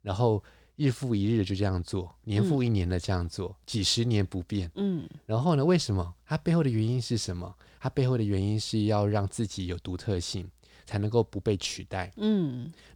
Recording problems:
none

